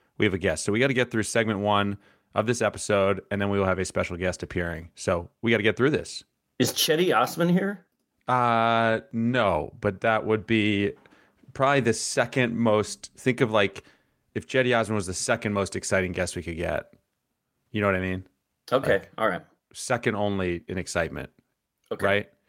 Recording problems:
none

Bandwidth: 16 kHz